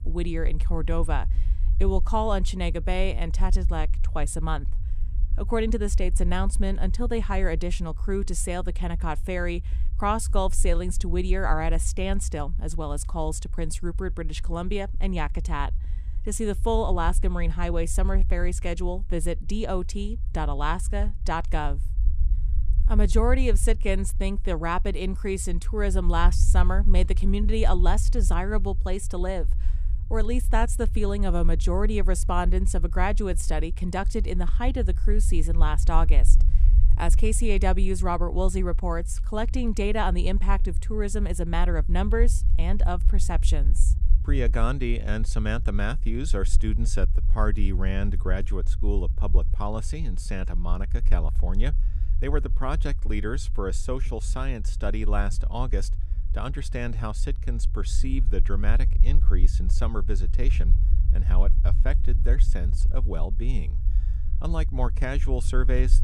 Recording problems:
low rumble; noticeable; throughout; 20 dB below the speech

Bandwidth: 14.5 kHz